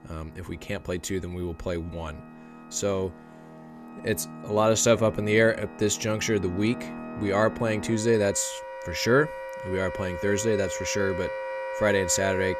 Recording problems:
background music; noticeable; throughout; 10 dB below the speech

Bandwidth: 14.5 kHz